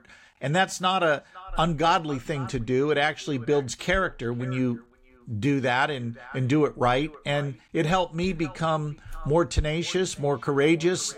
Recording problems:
echo of what is said; faint; throughout; 510 ms later, 20 dB below the speech

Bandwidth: 16 kHz